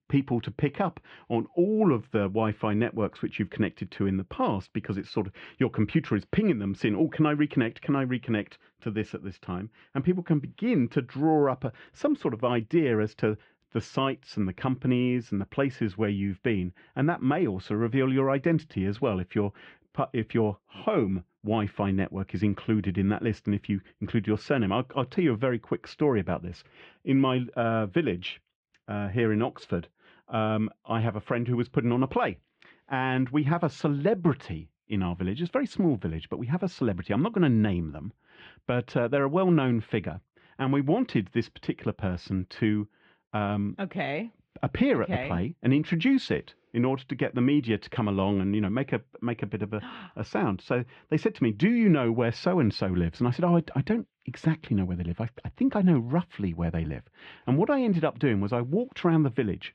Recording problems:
muffled; very; fading above 3 kHz

